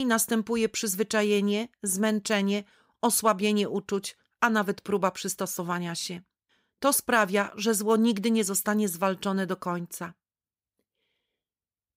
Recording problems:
abrupt cut into speech; at the start

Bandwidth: 15.5 kHz